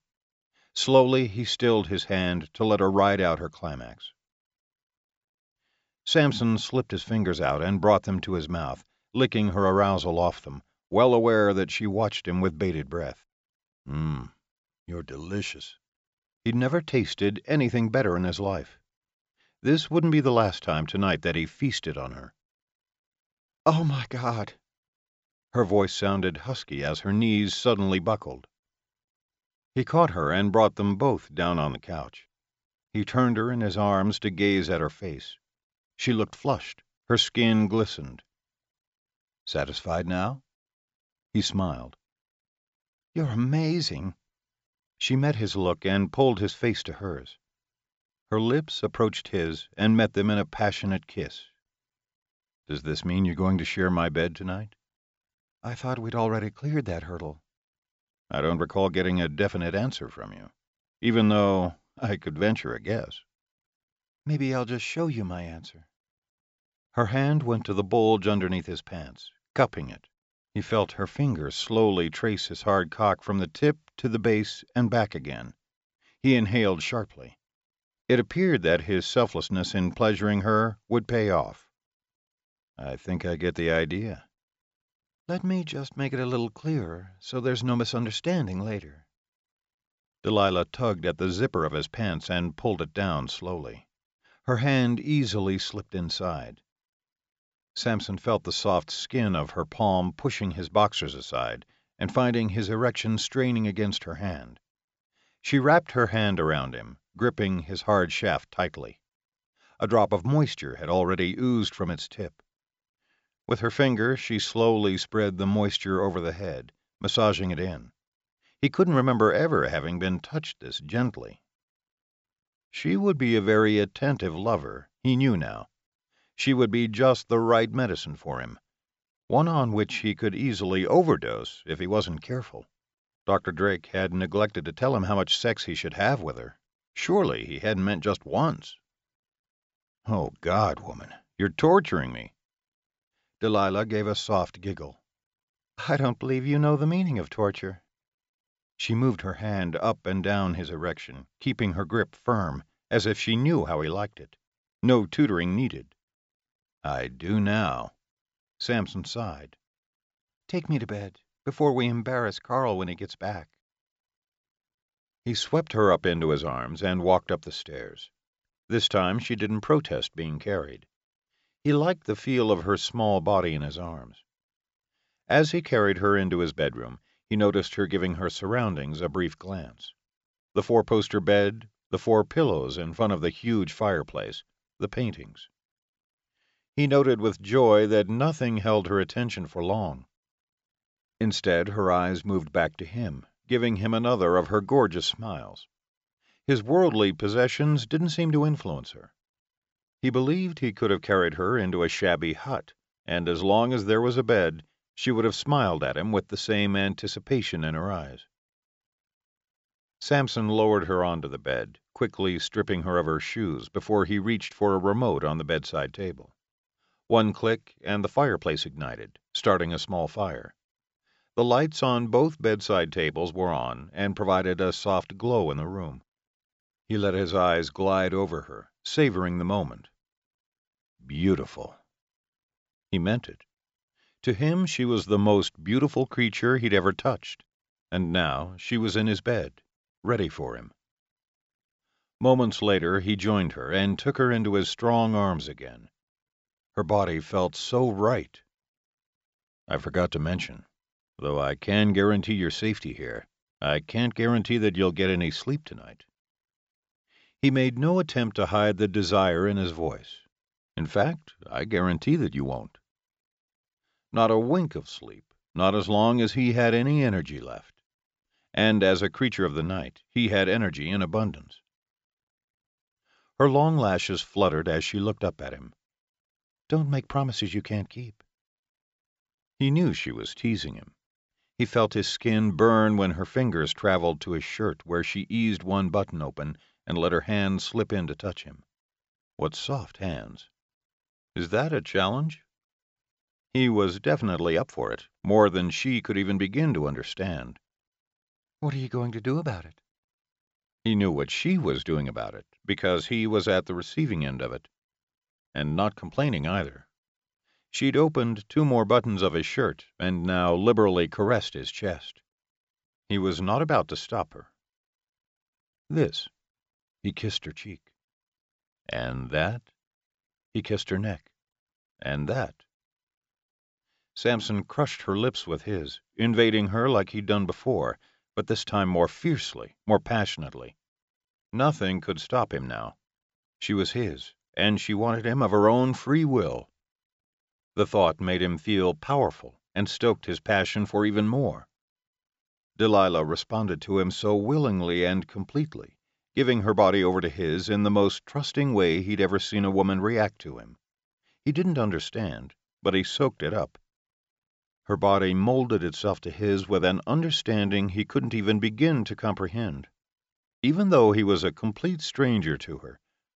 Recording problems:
high frequencies cut off; noticeable; nothing above 7.5 kHz

